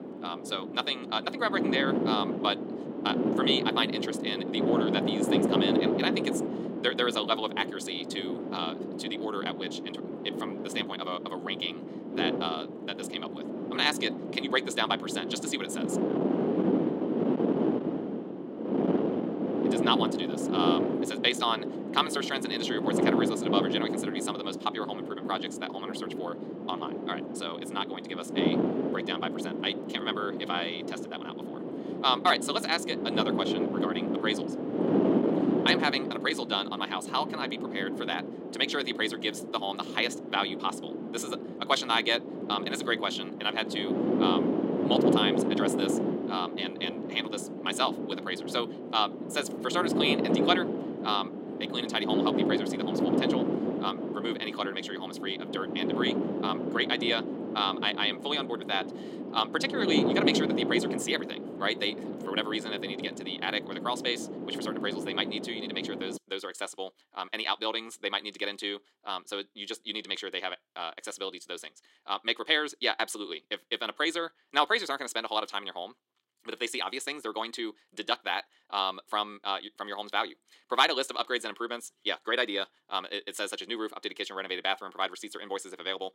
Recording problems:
wrong speed, natural pitch; too fast; 1.6 times normal speed
thin; somewhat; fading below 300 Hz
wind noise on the microphone; heavy; until 1:06; 4 dB below the speech

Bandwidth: 16 kHz